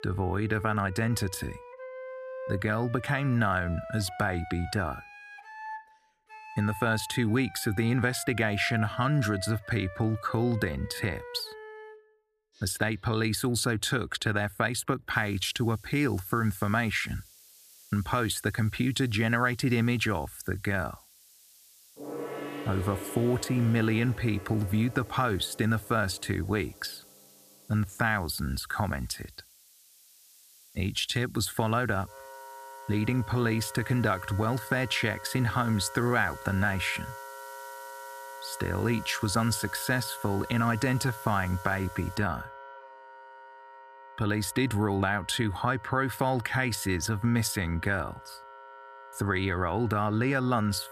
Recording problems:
background music; noticeable; throughout; 15 dB below the speech
hiss; faint; from 15 to 42 s; 25 dB below the speech

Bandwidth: 14.5 kHz